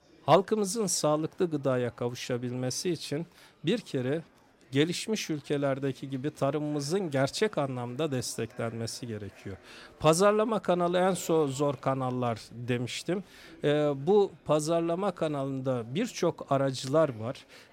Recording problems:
murmuring crowd; faint; throughout; 25 dB below the speech

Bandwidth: 16 kHz